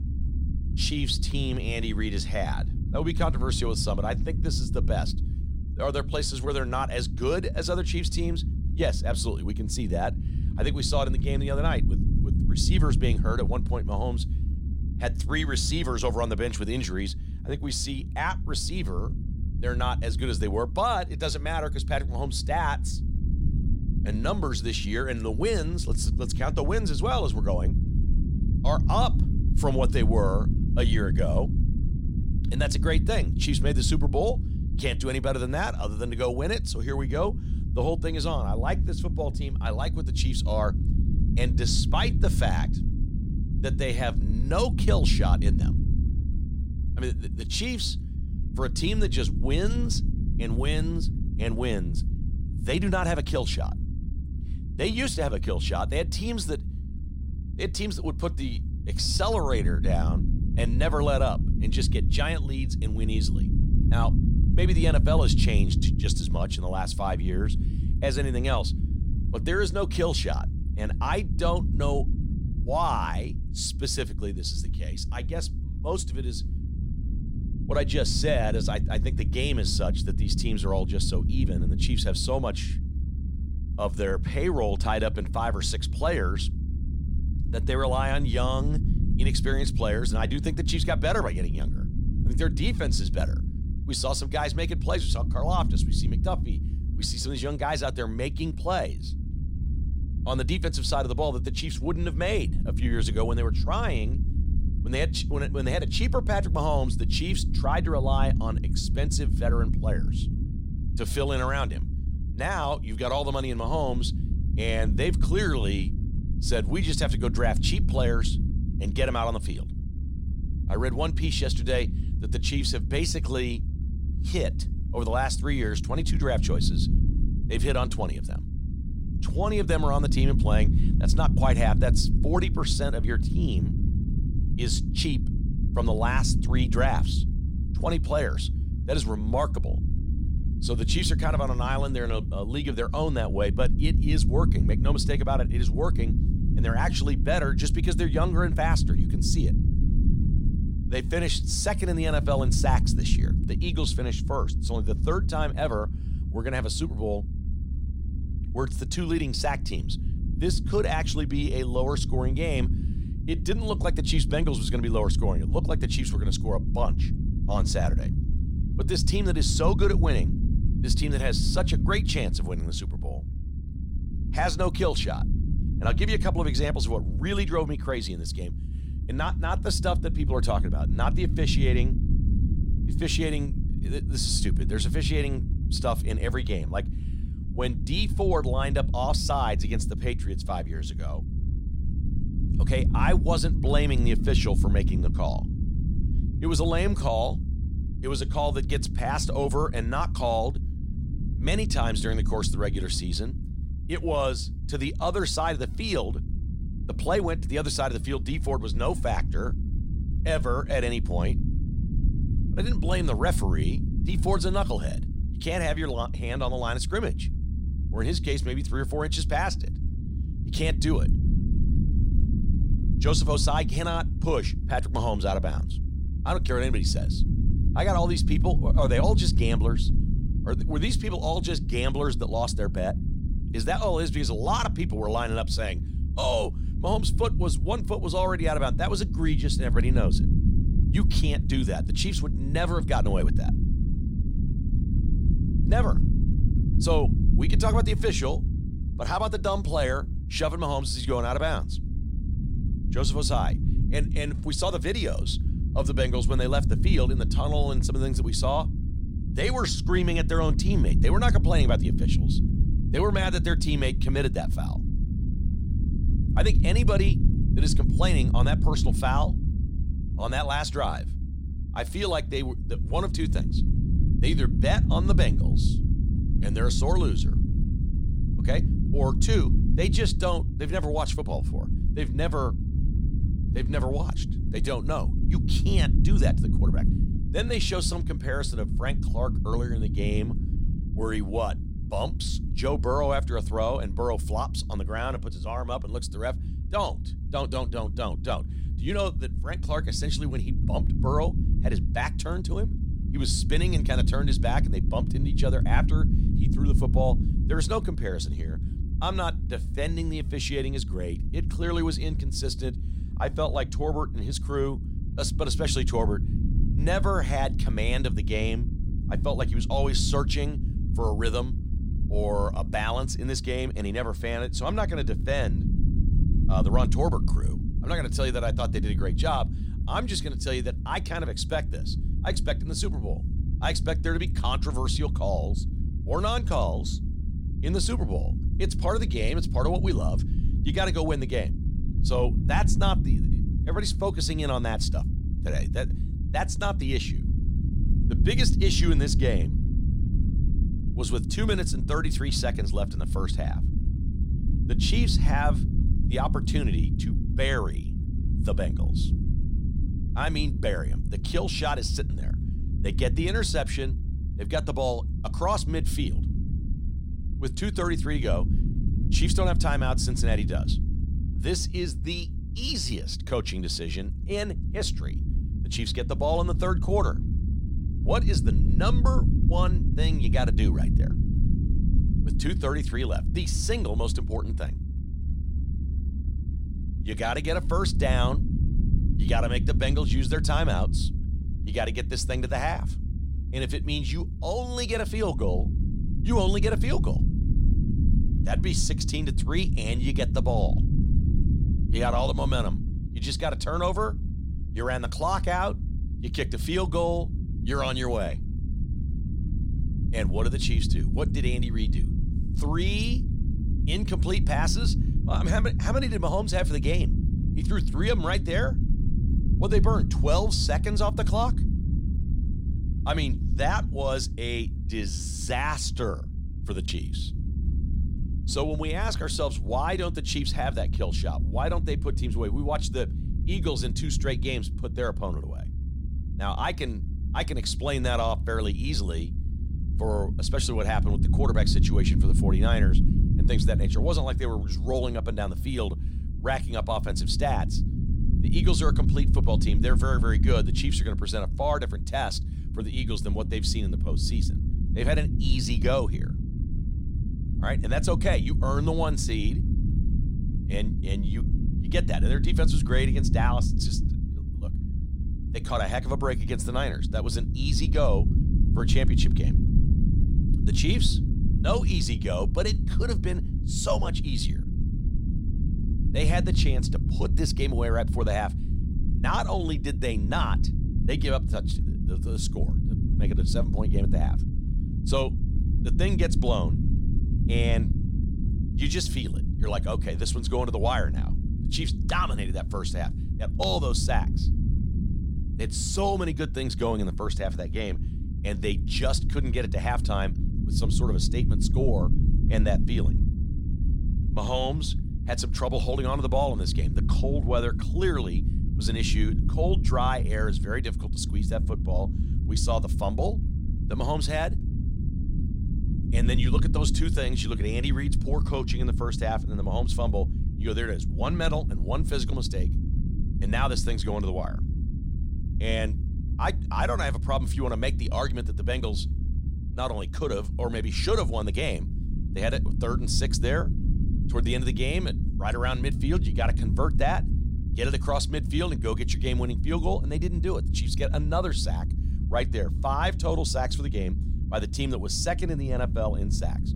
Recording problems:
low rumble; noticeable; throughout; 10 dB below the speech

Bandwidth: 16 kHz